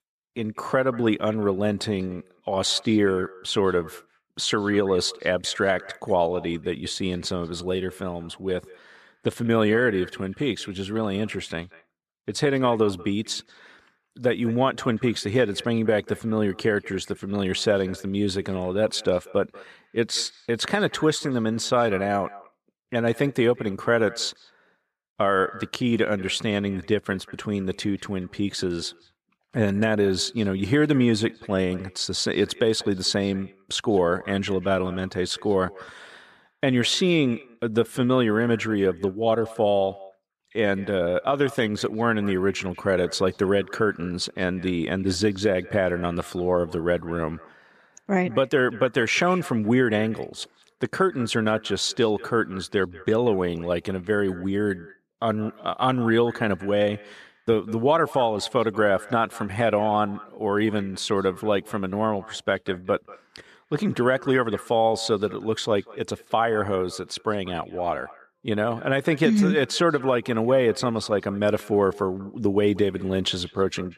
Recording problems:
echo of what is said; faint; throughout; 190 ms later, 20 dB below the speech

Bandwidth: 14.5 kHz